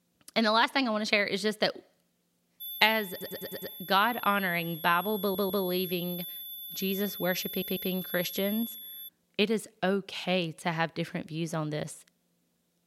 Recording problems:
high-pitched whine; loud; from 2.5 to 9 s; 11.5 kHz, 9 dB below the speech
audio stuttering; at 3 s, at 5 s and at 7.5 s

